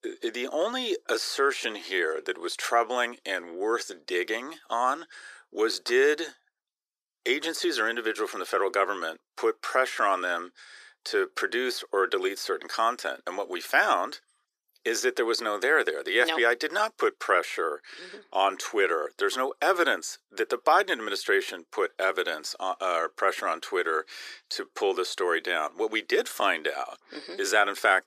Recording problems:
thin; very; fading below 350 Hz

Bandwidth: 14.5 kHz